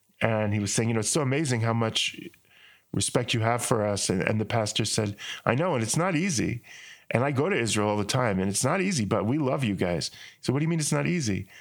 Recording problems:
squashed, flat; heavily

